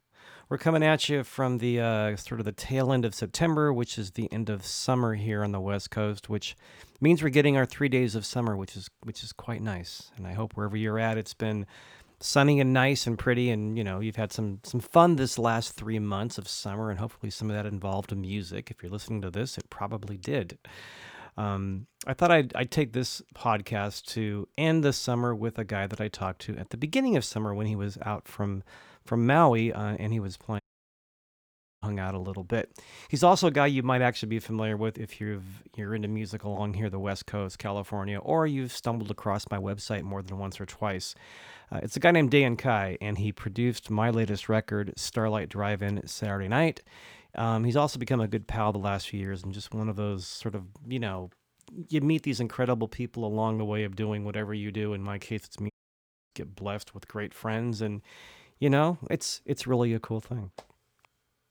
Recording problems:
audio cutting out; at 31 s for 1 s and at 56 s for 0.5 s

